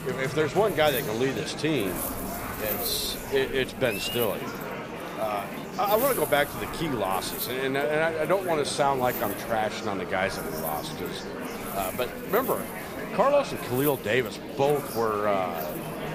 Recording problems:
murmuring crowd; loud; throughout; 8 dB below the speech
wind noise on the microphone; occasional gusts; 15 dB below the speech

